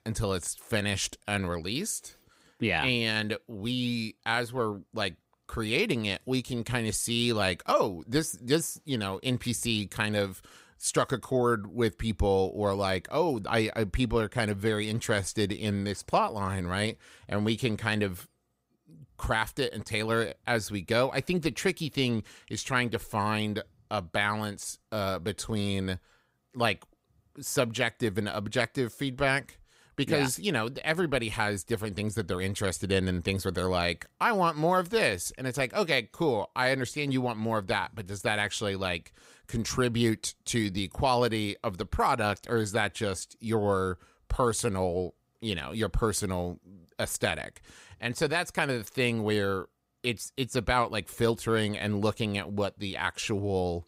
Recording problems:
none

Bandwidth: 15.5 kHz